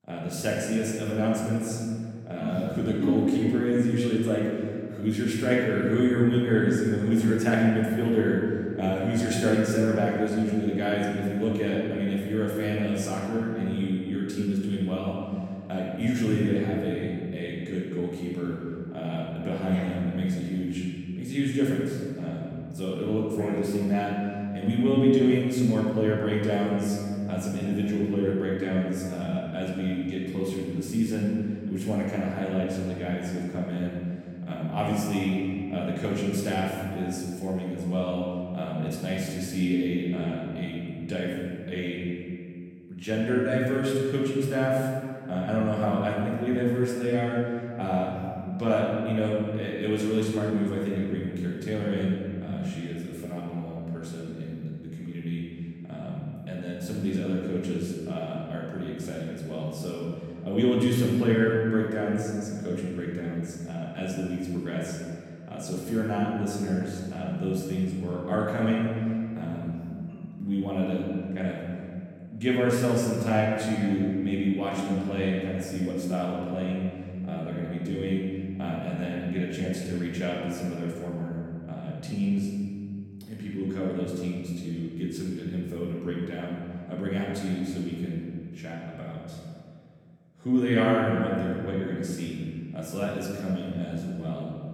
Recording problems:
off-mic speech; far
room echo; noticeable; dies away in 2.1 s

